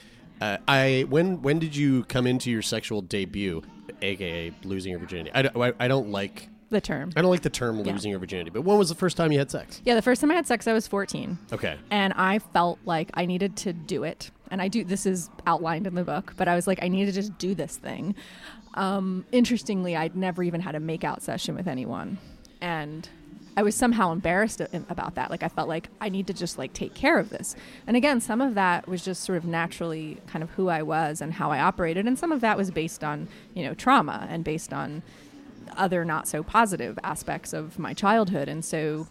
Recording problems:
chatter from many people; faint; throughout; 25 dB below the speech

